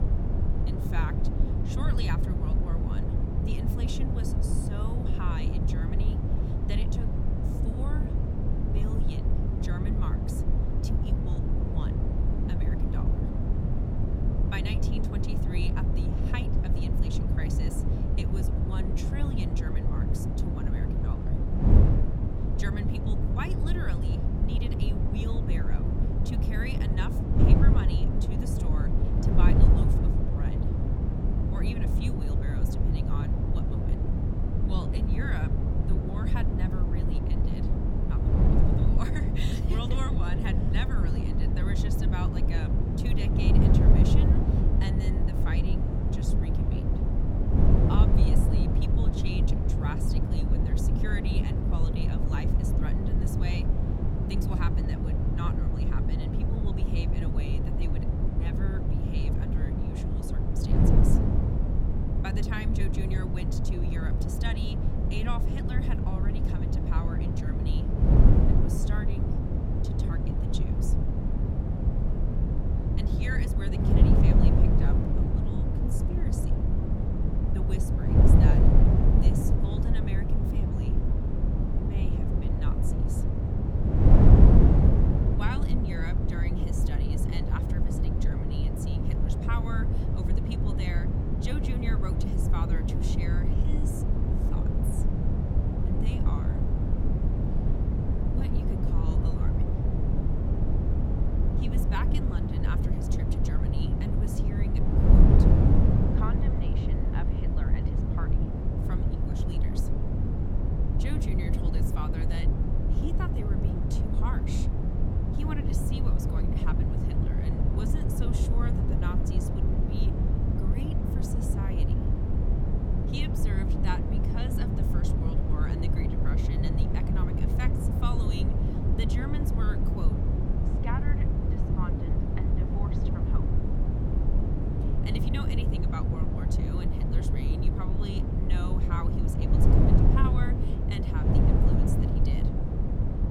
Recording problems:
wind noise on the microphone; heavy; 4 dB above the speech

